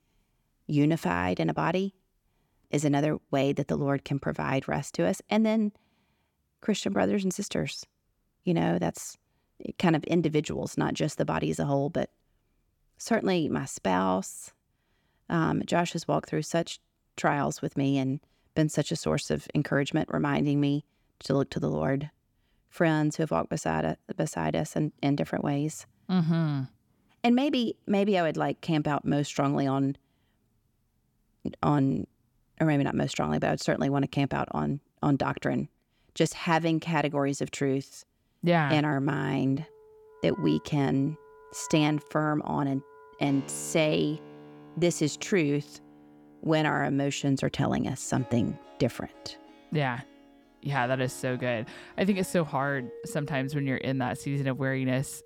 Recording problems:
background music; faint; from 39 s on; 20 dB below the speech

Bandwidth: 17.5 kHz